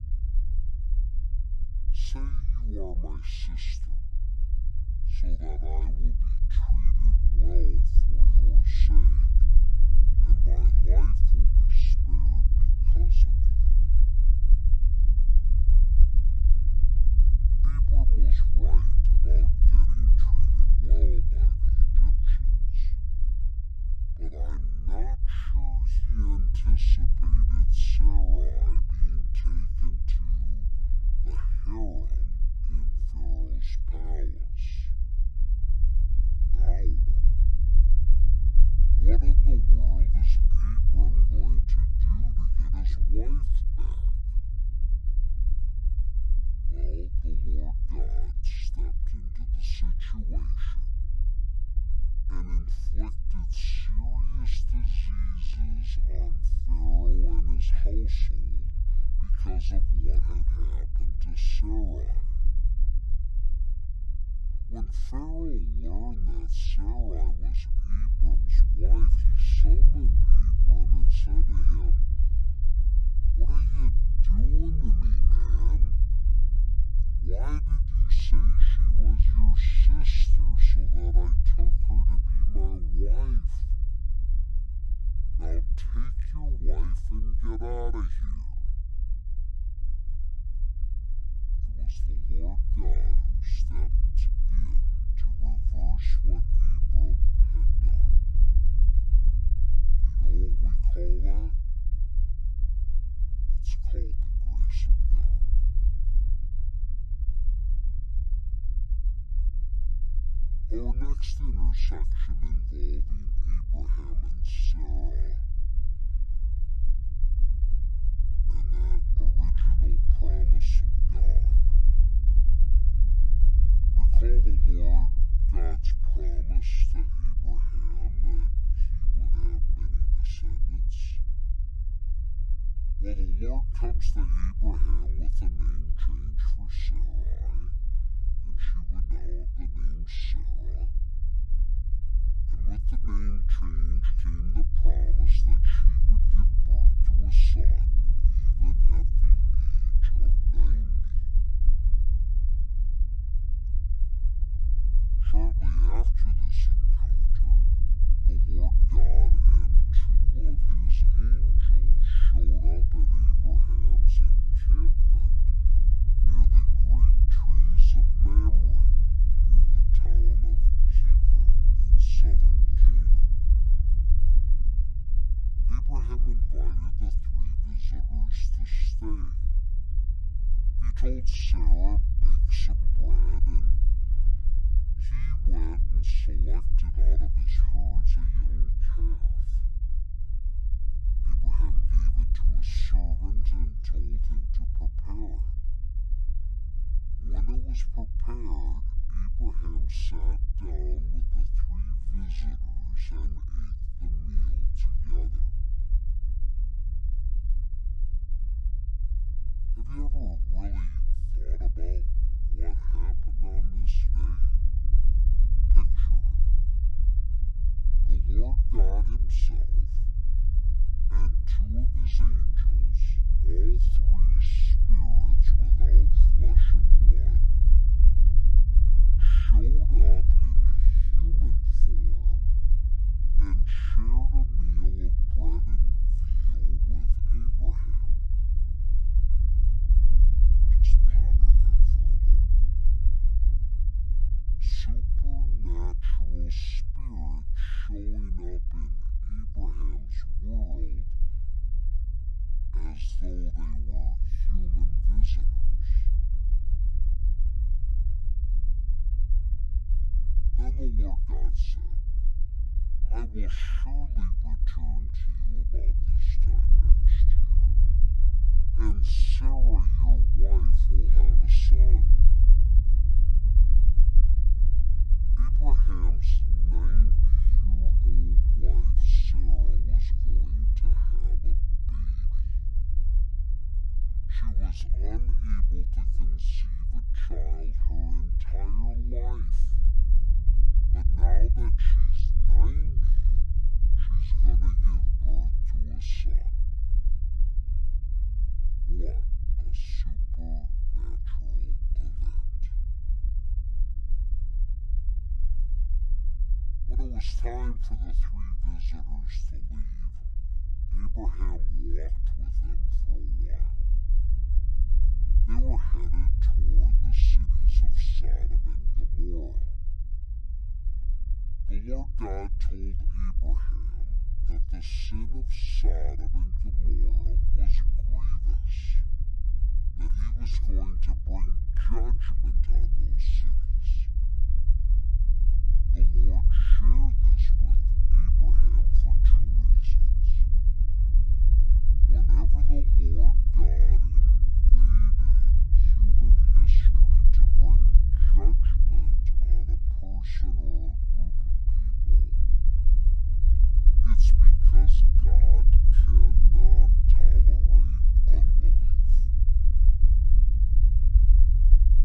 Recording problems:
wrong speed and pitch; too slow and too low; 0.6 times normal speed
low rumble; loud; throughout; 2 dB below the speech

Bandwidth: 12.5 kHz